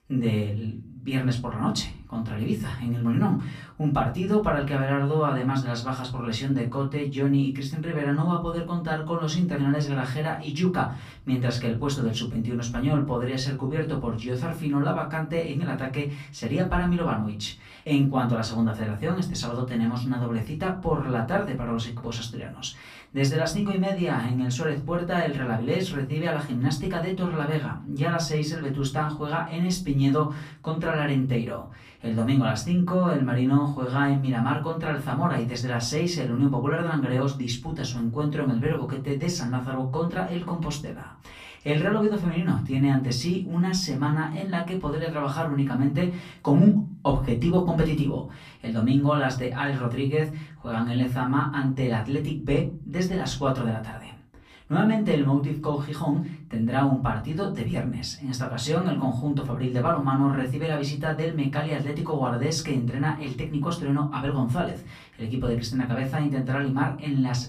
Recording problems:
off-mic speech; far
room echo; very slight; dies away in 0.3 s

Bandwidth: 15 kHz